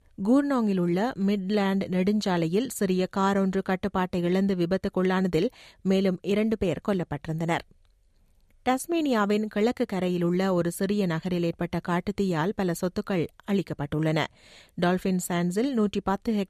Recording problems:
none

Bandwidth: 14.5 kHz